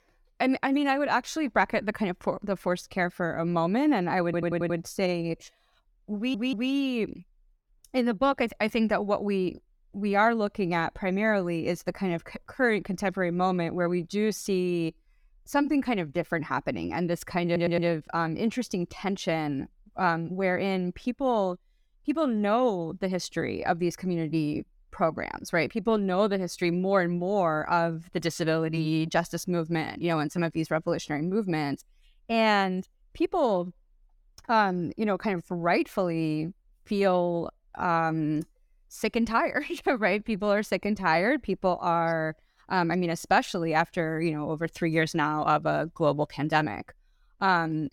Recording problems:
audio stuttering; at 4.5 s, at 6 s and at 17 s

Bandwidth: 17.5 kHz